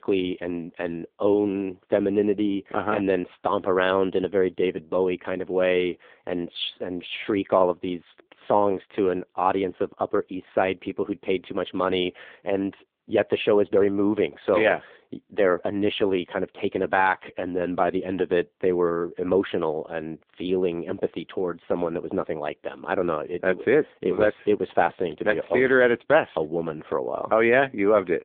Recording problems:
phone-call audio; poor line; nothing above 3.5 kHz

